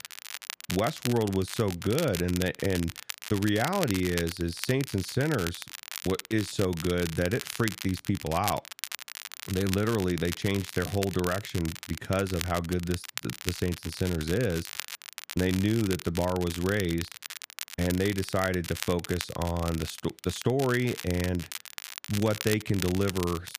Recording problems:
crackle, like an old record; loud; 9 dB below the speech

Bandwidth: 15 kHz